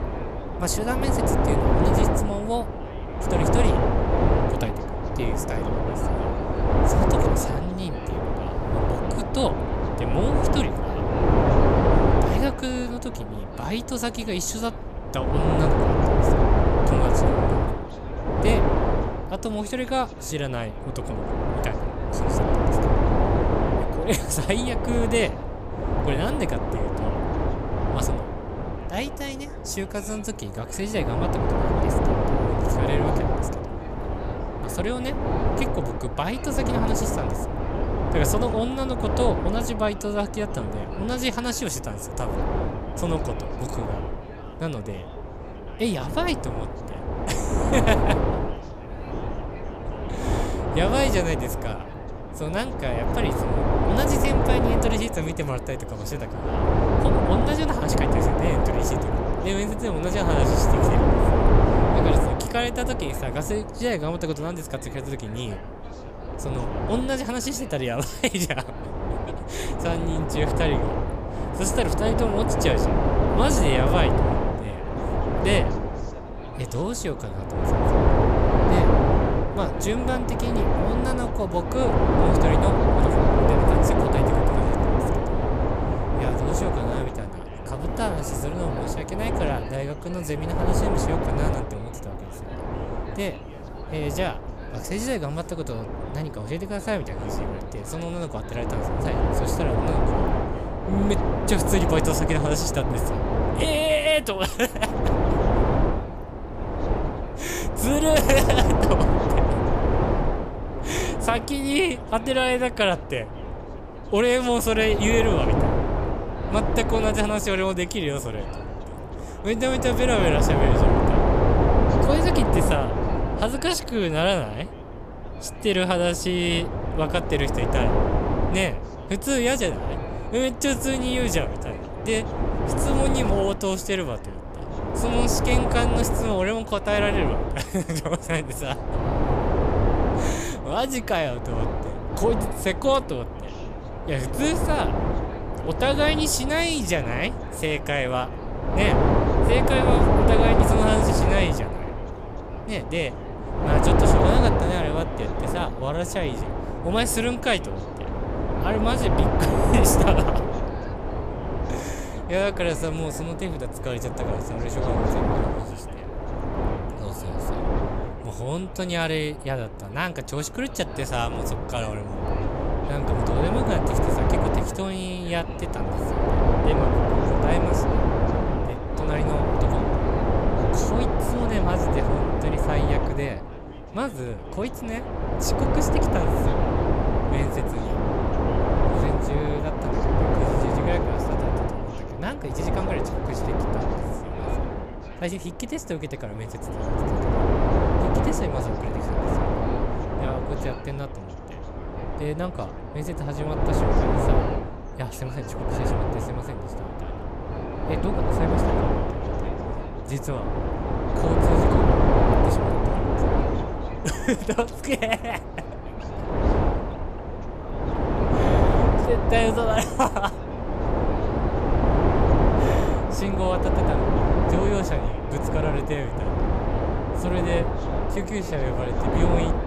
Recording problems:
wind noise on the microphone; heavy; 1 dB above the speech
background chatter; faint; throughout; 3 voices, 20 dB below the speech

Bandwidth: 14.5 kHz